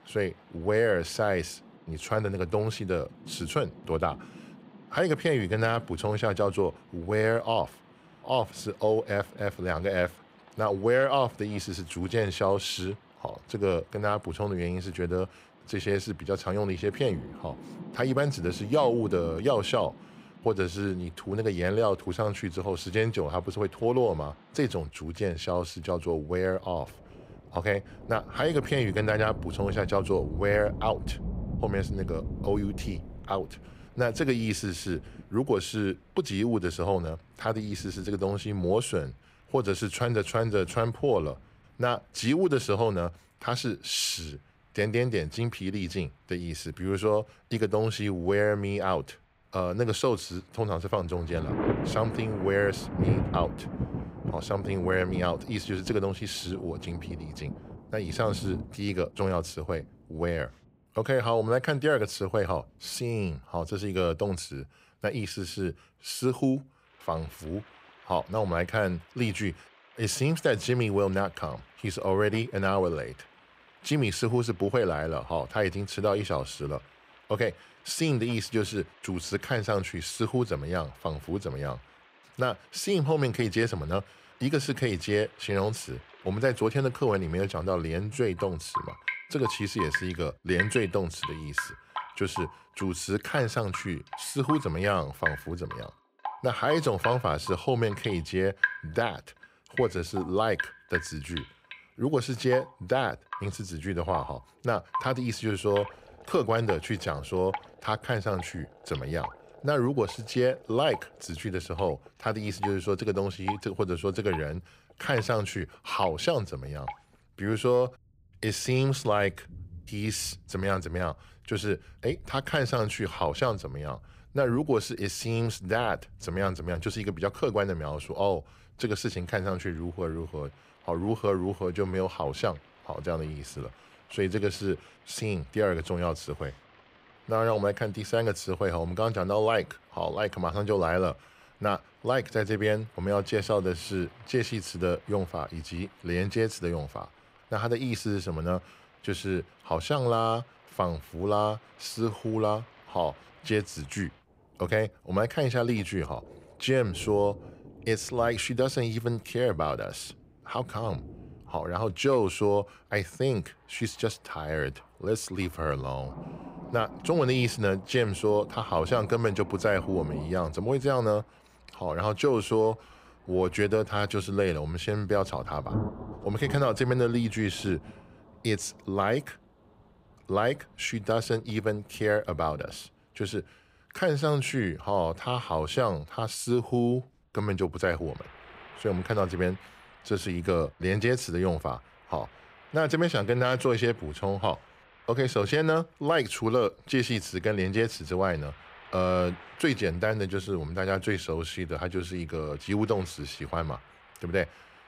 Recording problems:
rain or running water; noticeable; throughout; 10 dB below the speech

